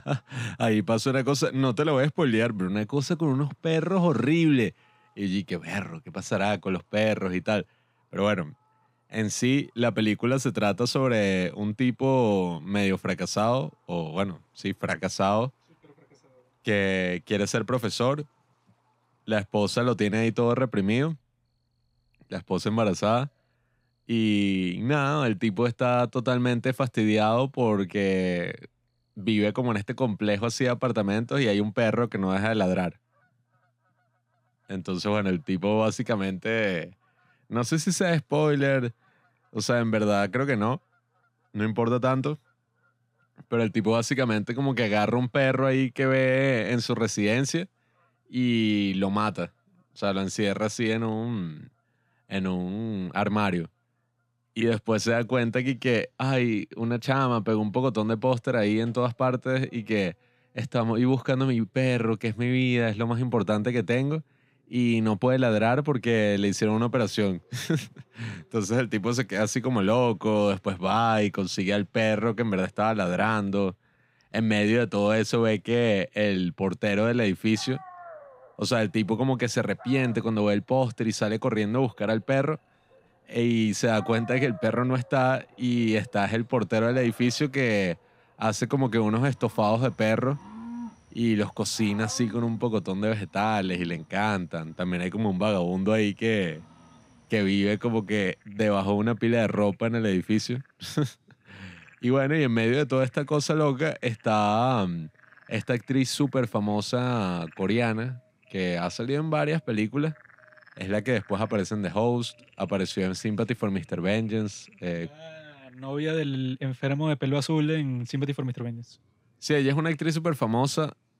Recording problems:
animal sounds; faint; throughout; 25 dB below the speech

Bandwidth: 15.5 kHz